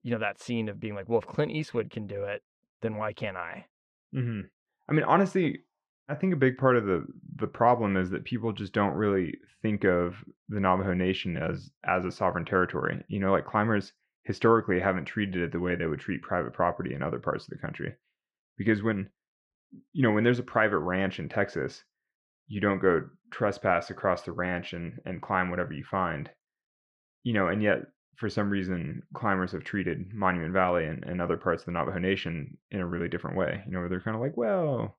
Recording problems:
muffled; slightly; fading above 3 kHz

